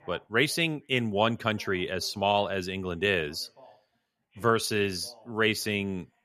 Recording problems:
voice in the background; faint; throughout; 30 dB below the speech

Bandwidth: 14.5 kHz